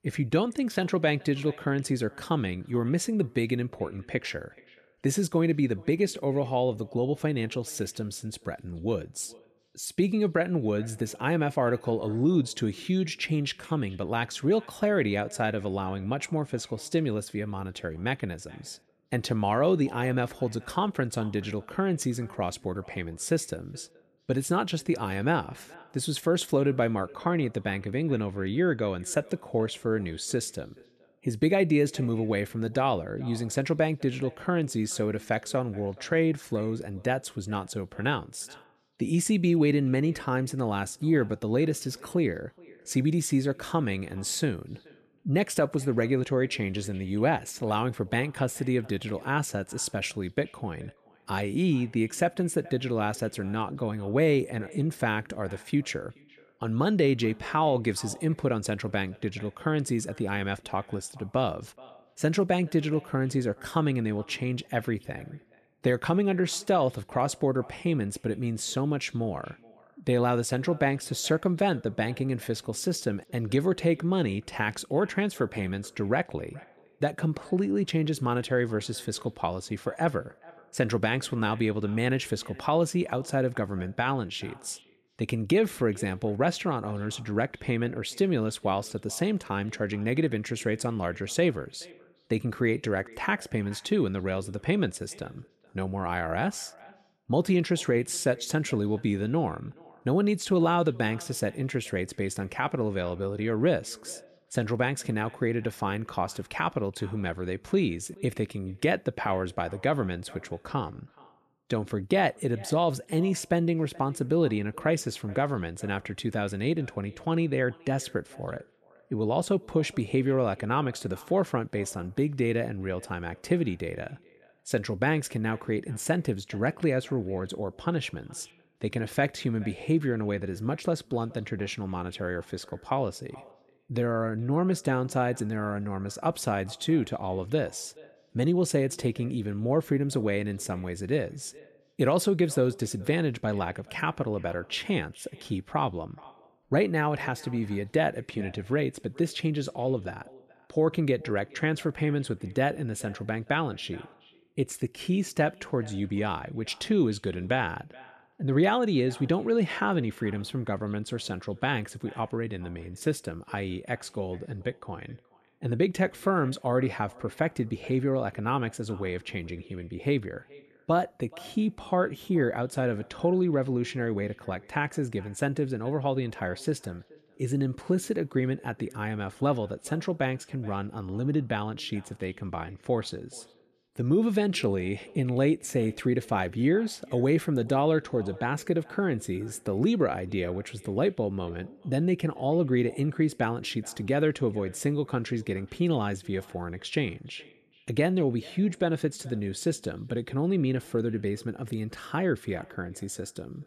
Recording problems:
echo of what is said; faint; throughout; 430 ms later, 25 dB below the speech

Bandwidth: 14.5 kHz